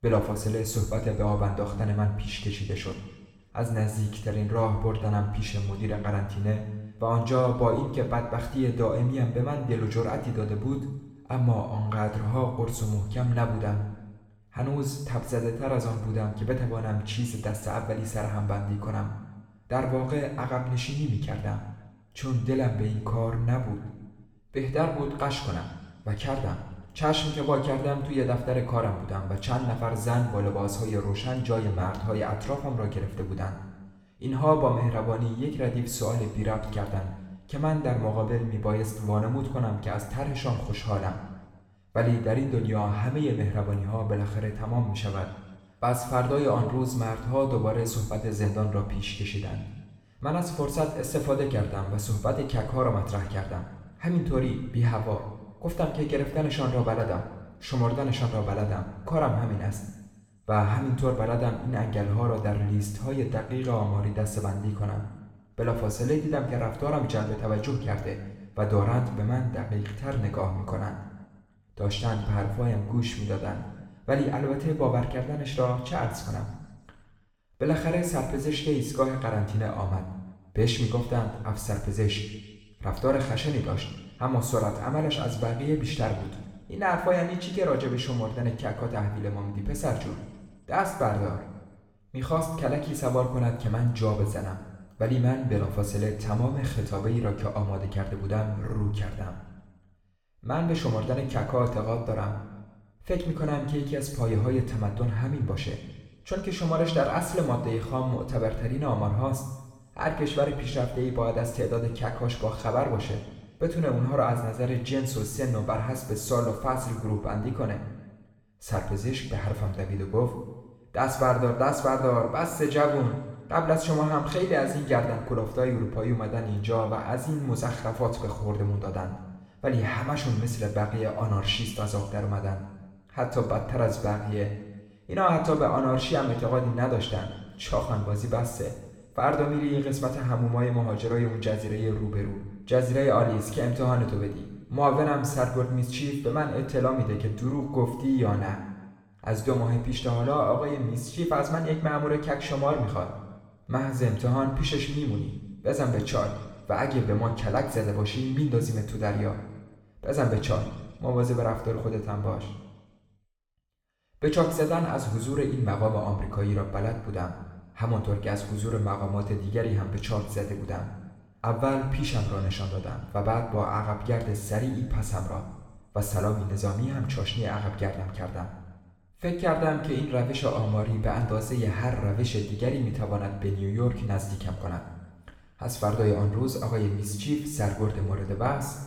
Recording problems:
room echo; noticeable; dies away in 1.1 s
off-mic speech; somewhat distant

